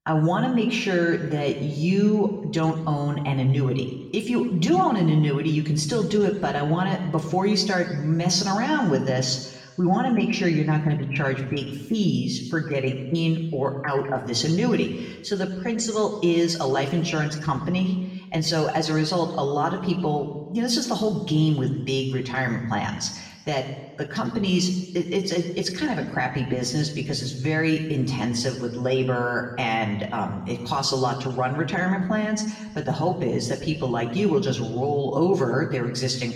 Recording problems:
off-mic speech; far
room echo; slight; dies away in 1 s

